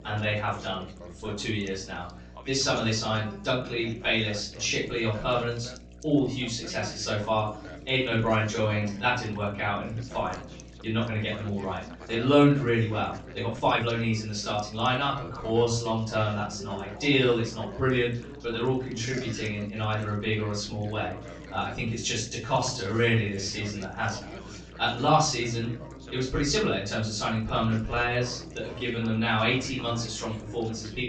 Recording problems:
off-mic speech; far
high frequencies cut off; noticeable; nothing above 8 kHz
room echo; slight; dies away in 0.4 s
background chatter; noticeable; throughout; 3 voices, 15 dB below the speech
electrical hum; faint; throughout; 60 Hz, 25 dB below the speech
uneven, jittery; strongly; from 7.5 to 29 s

